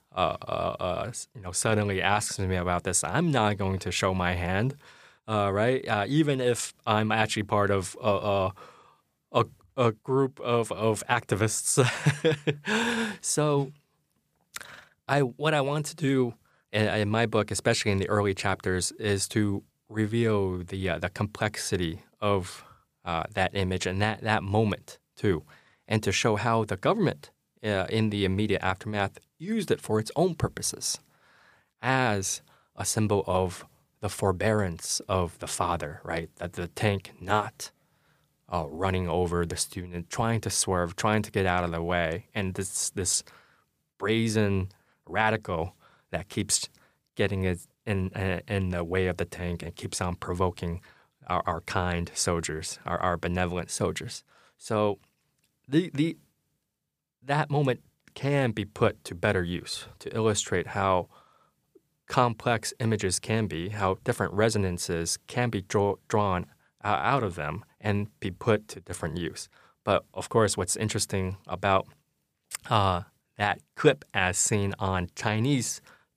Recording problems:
none

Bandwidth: 15 kHz